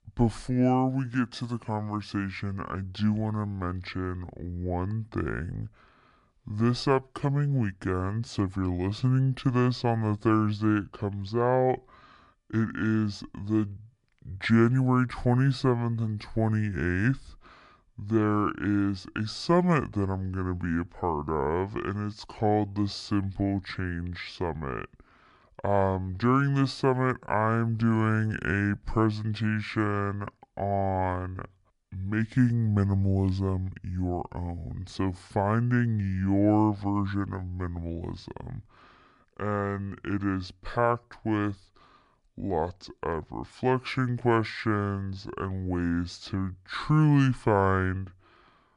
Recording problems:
wrong speed and pitch; too slow and too low; 0.6 times normal speed

